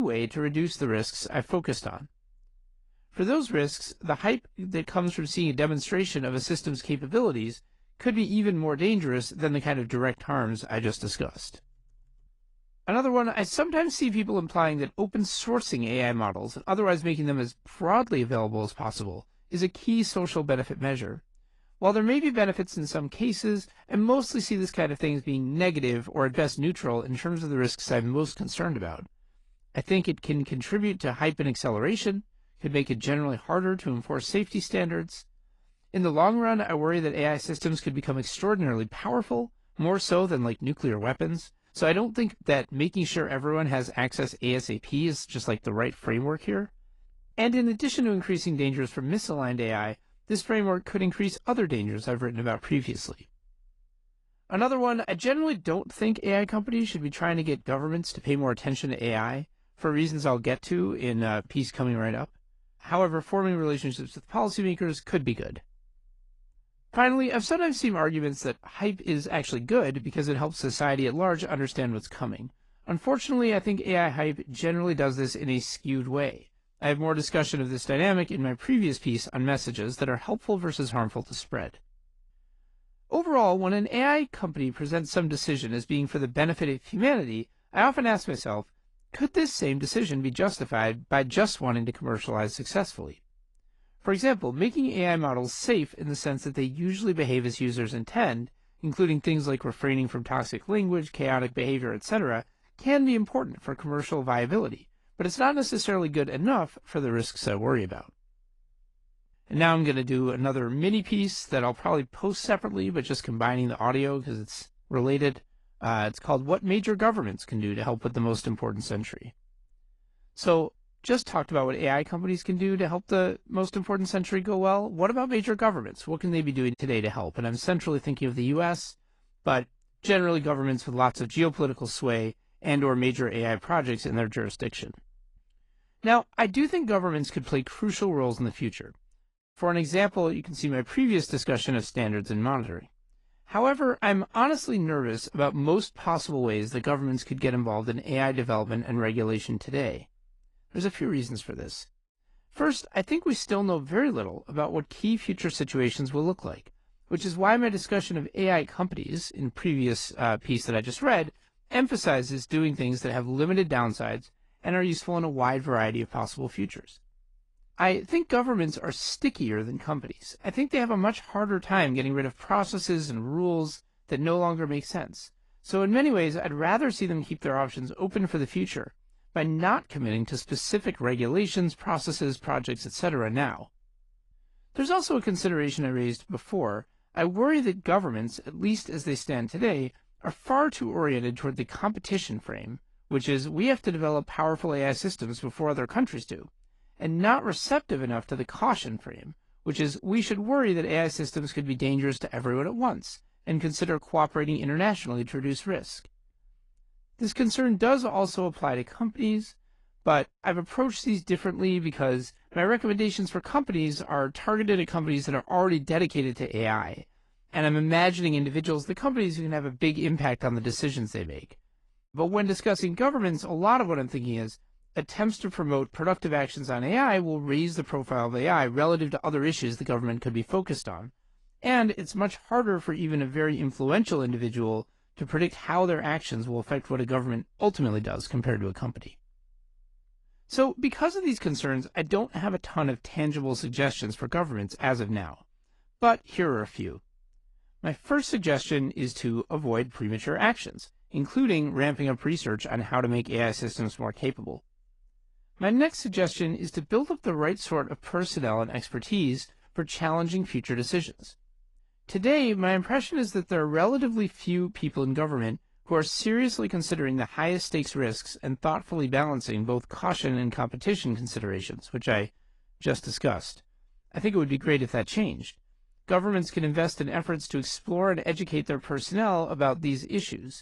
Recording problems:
garbled, watery; slightly; nothing above 10.5 kHz
abrupt cut into speech; at the start

